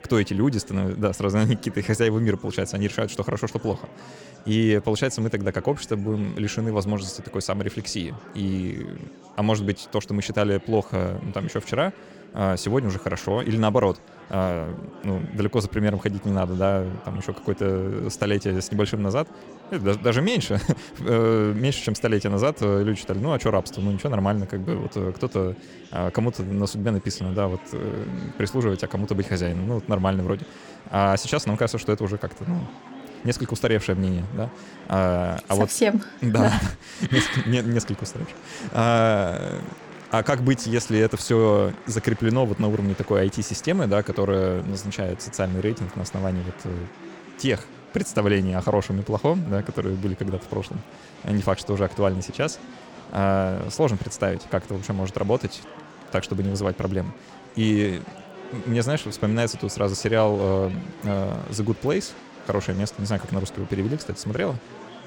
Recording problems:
chatter from many people; noticeable; throughout; 20 dB below the speech

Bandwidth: 17.5 kHz